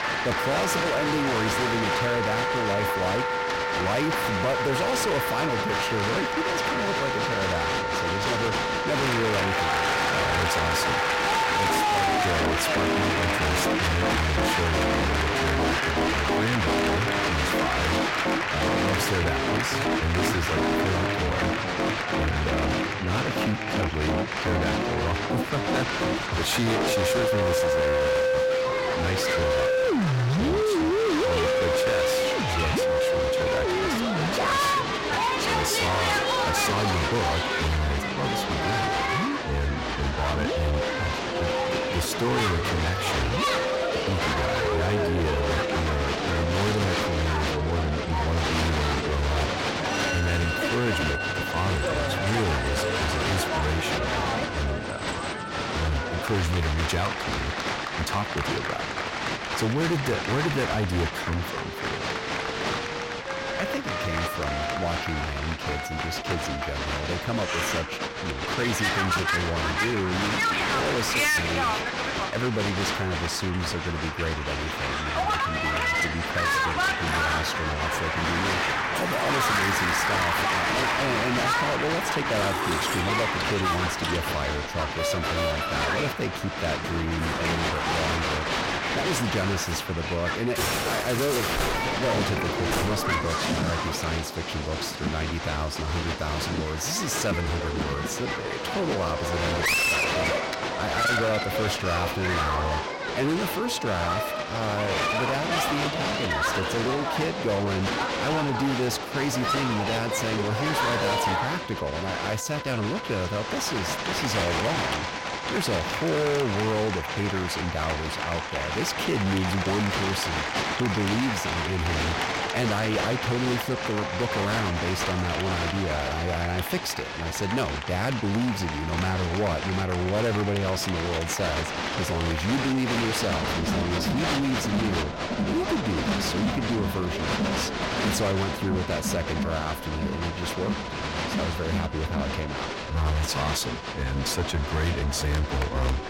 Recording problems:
distortion; heavy; 20% of the sound clipped
crowd noise; very loud; throughout; 1 dB above the speech
background music; loud; throughout; 1 dB below the speech

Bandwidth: 16.5 kHz